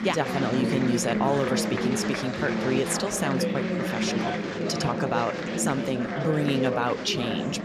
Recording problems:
chatter from many people; loud; throughout; as loud as the speech

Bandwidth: 13.5 kHz